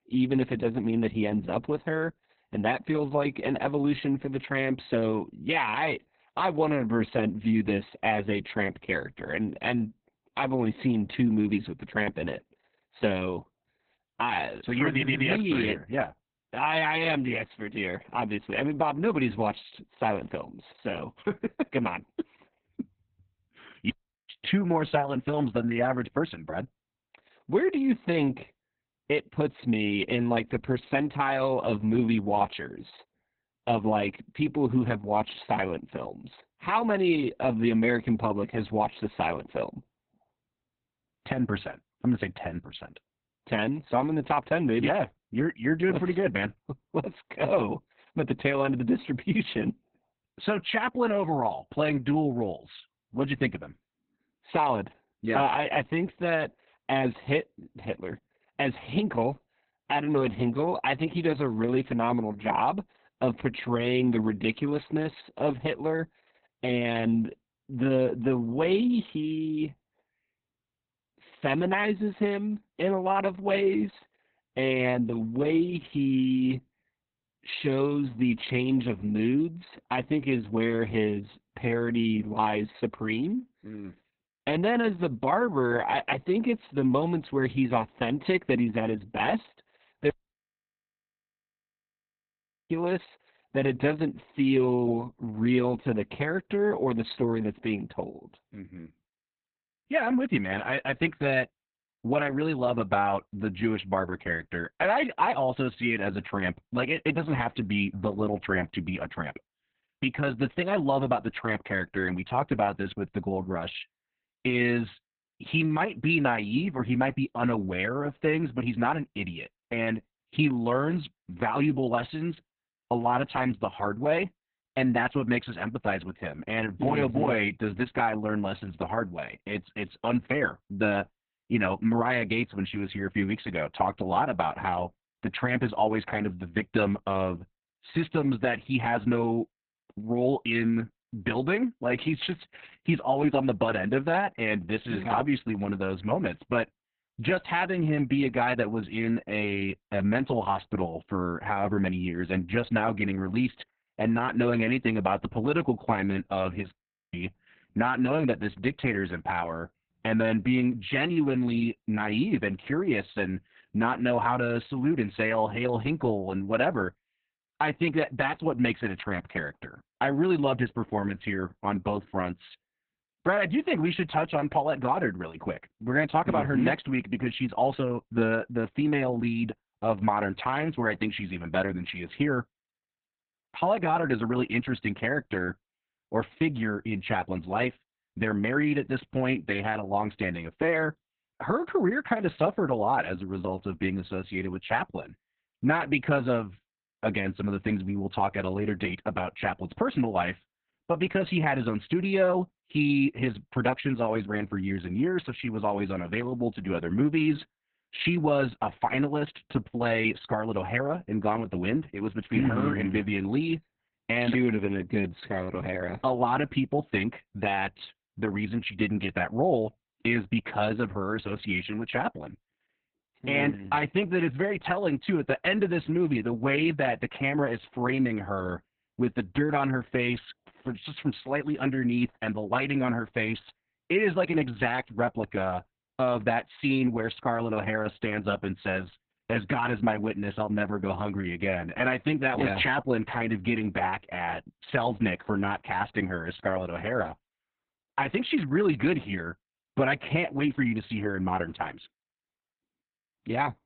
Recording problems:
garbled, watery; badly; nothing above 4 kHz
audio stuttering; at 15 s
audio cutting out; at 24 s, at 1:30 for 2.5 s and at 2:37

